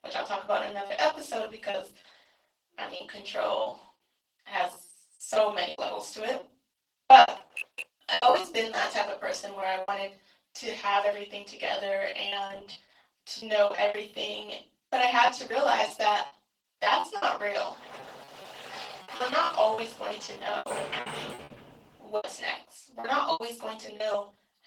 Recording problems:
off-mic speech; far
thin; very; fading below 650 Hz
room echo; slight; dies away in 0.3 s
garbled, watery; slightly; nothing above 18.5 kHz
choppy; very; 13% of the speech affected
keyboard typing; noticeable; at 7.5 s; peak 10 dB below the speech
door banging; noticeable; from 18 to 22 s; peak 5 dB below the speech

